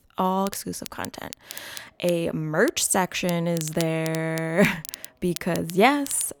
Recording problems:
crackle, like an old record; noticeable; 15 dB below the speech

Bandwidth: 18.5 kHz